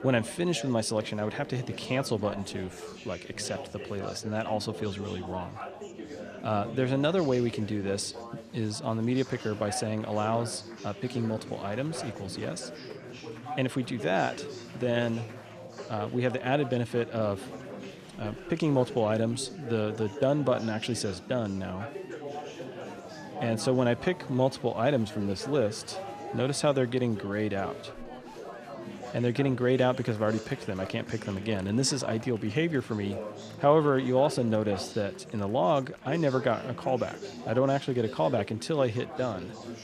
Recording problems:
chatter from many people; noticeable; throughout; 10 dB below the speech

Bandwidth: 14 kHz